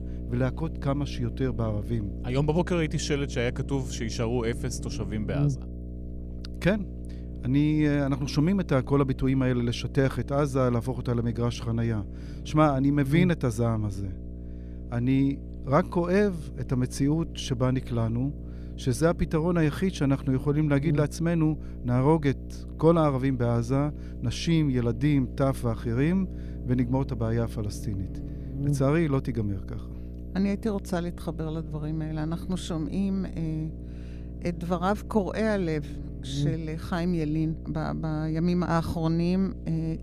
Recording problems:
electrical hum; noticeable; throughout; 60 Hz, 15 dB below the speech

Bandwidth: 14.5 kHz